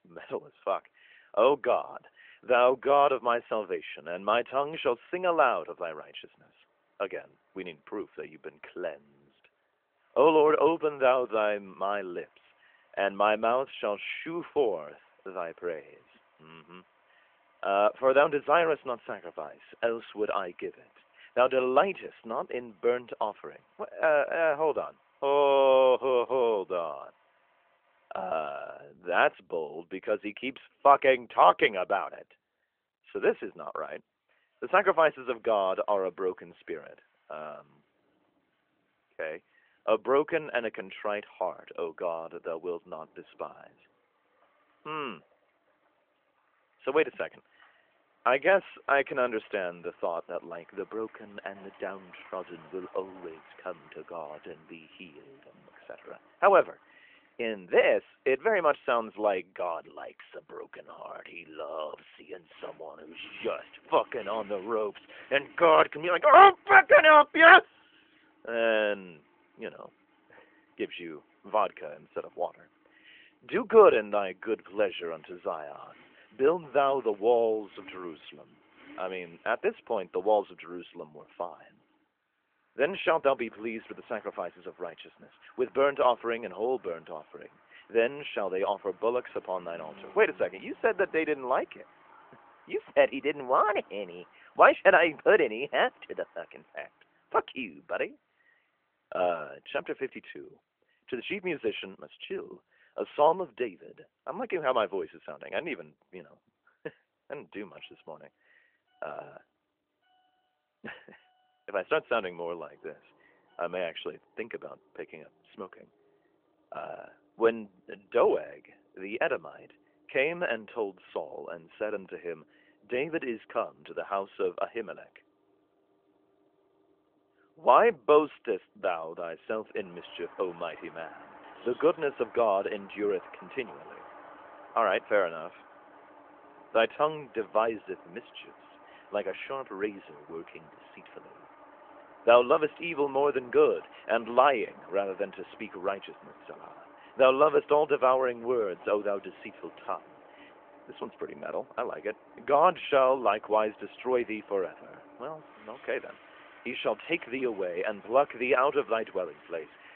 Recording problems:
phone-call audio; nothing above 3.5 kHz
traffic noise; faint; throughout; 30 dB below the speech

